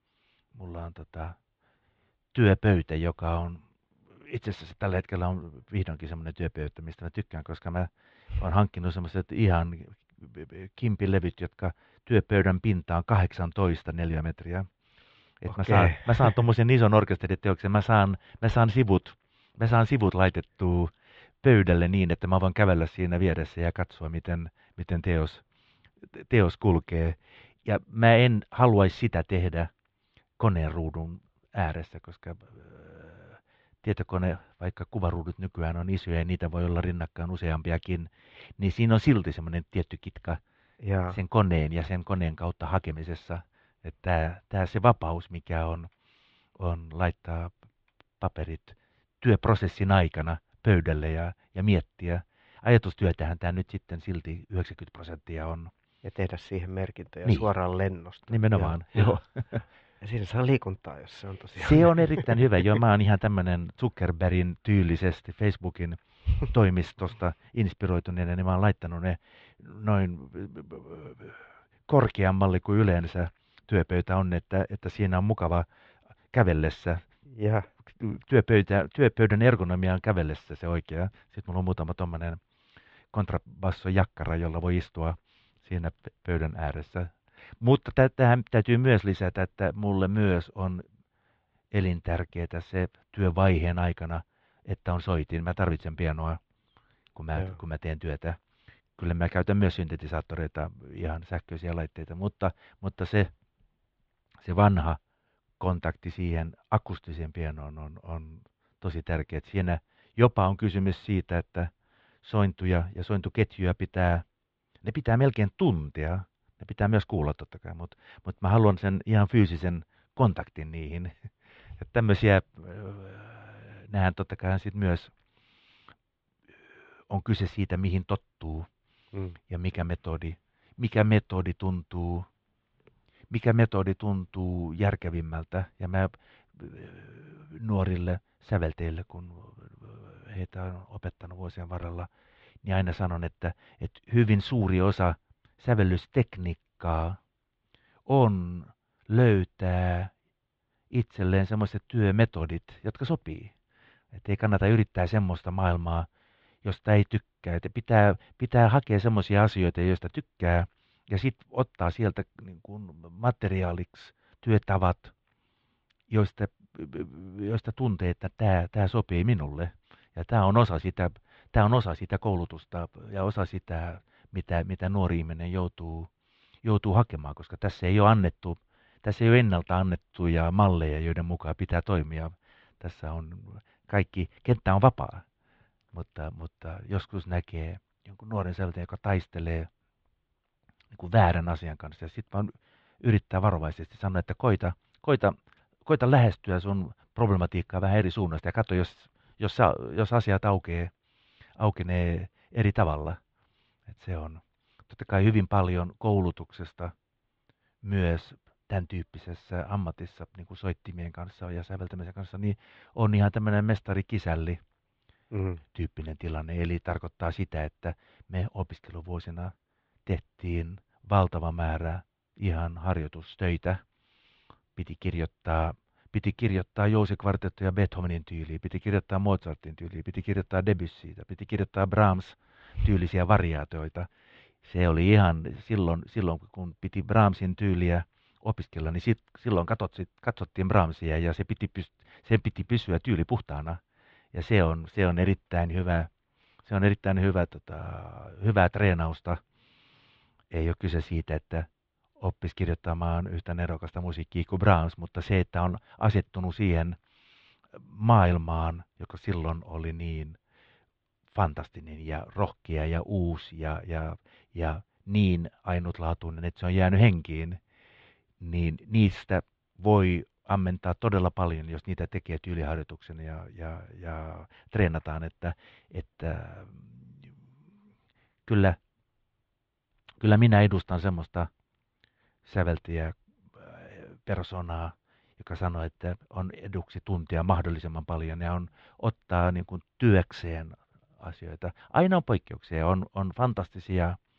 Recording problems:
muffled; very; fading above 3.5 kHz

